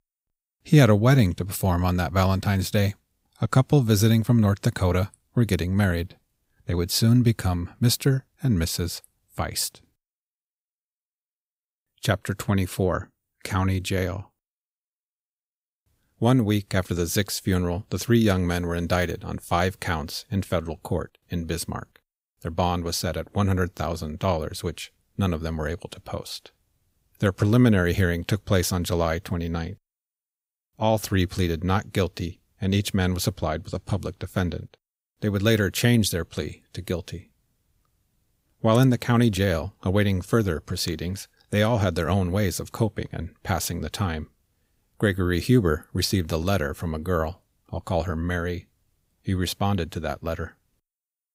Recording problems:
none

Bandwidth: 15.5 kHz